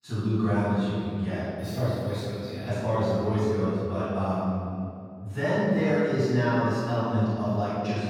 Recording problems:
room echo; strong; dies away in 2.4 s
off-mic speech; far

